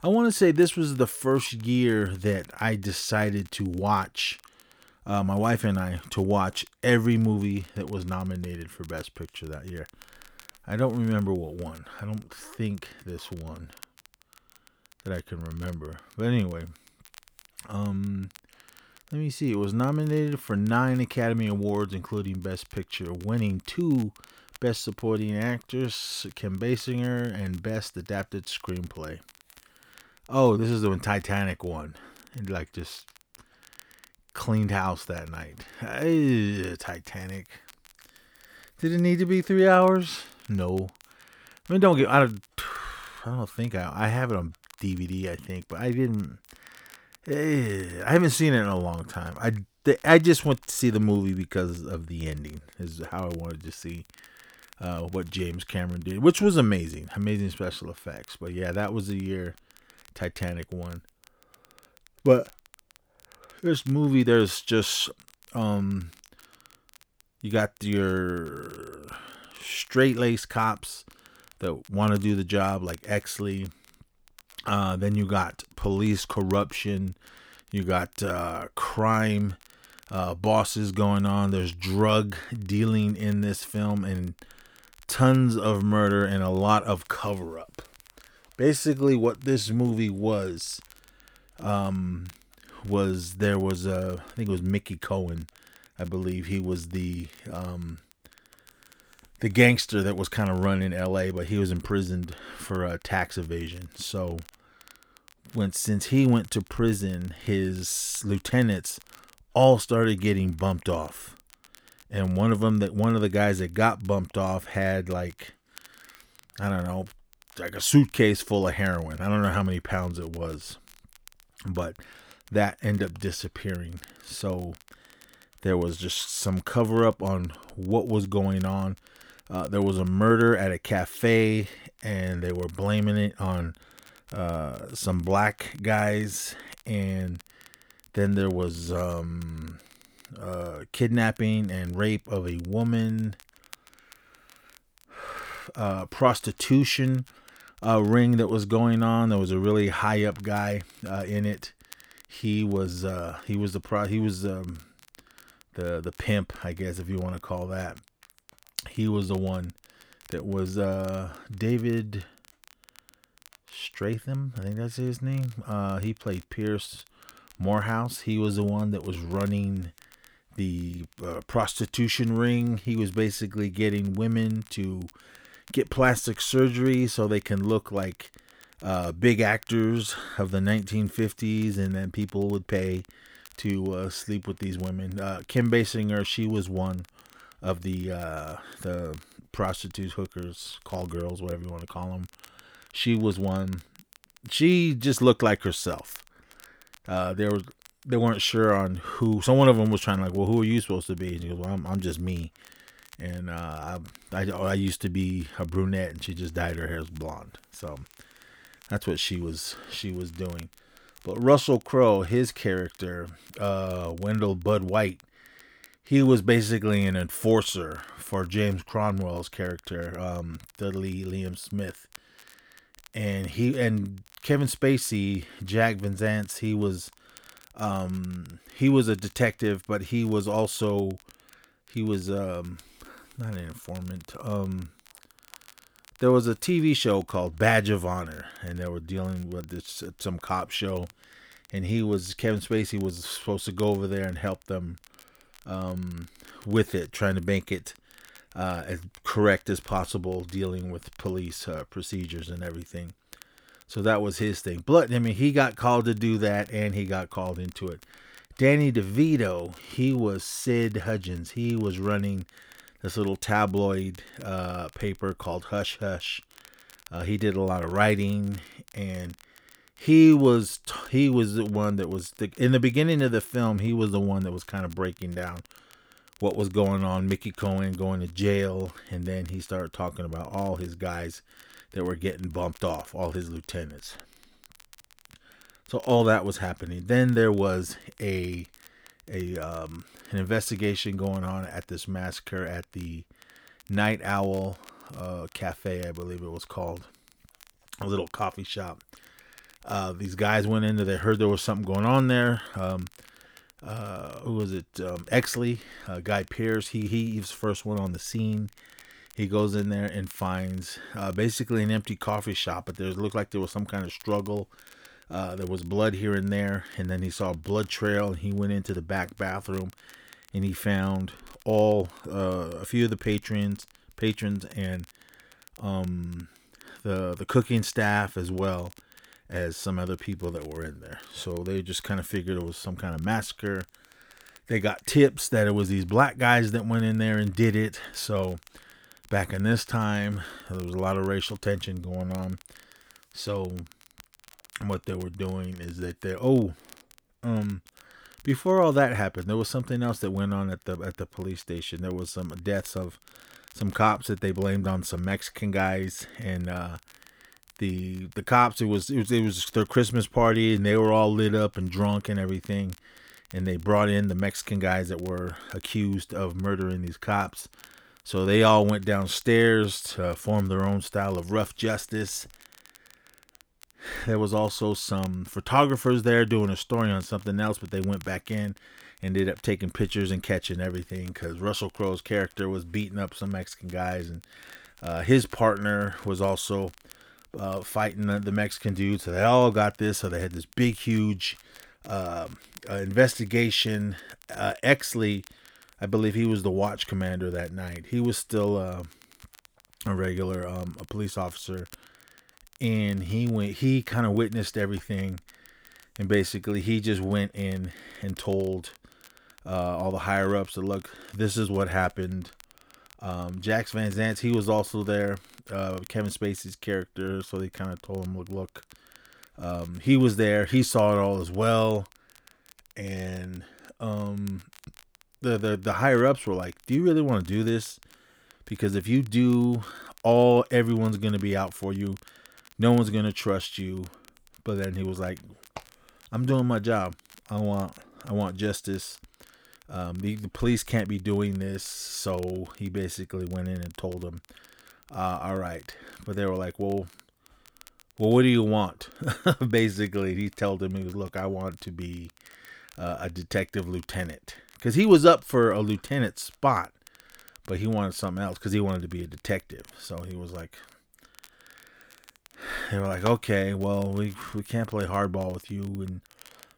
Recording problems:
crackle, like an old record; faint; 25 dB below the speech

